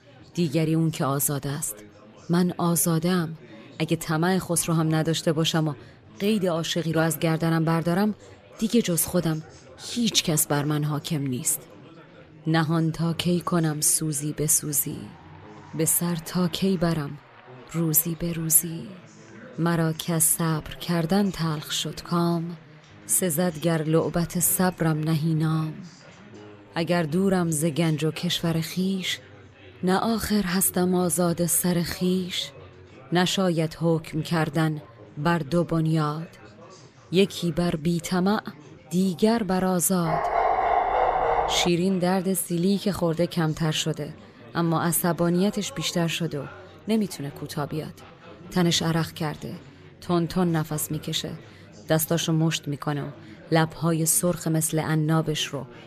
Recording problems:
chatter from many people; faint; throughout; 20 dB below the speech
dog barking; loud; from 40 to 42 s; peak 2 dB above the speech

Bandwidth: 14.5 kHz